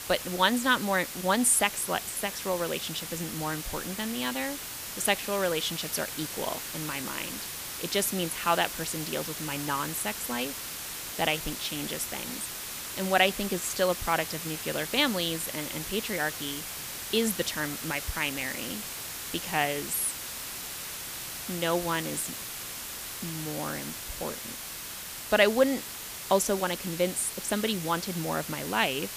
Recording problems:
hiss; loud; throughout; 6 dB below the speech

